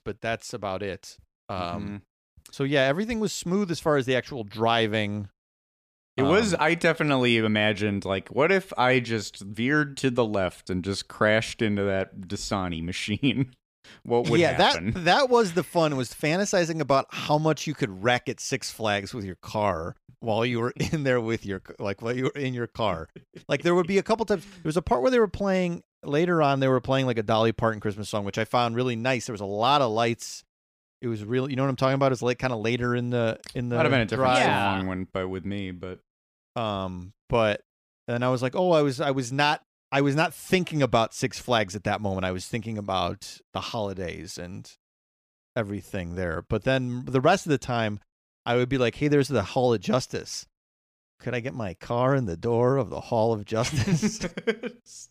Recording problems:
none

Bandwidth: 15 kHz